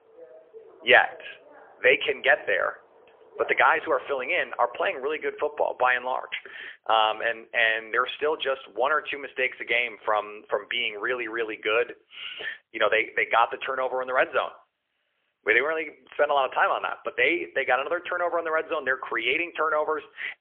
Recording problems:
phone-call audio; poor line; nothing above 3.5 kHz
traffic noise; faint; until 4.5 s; 20 dB below the speech

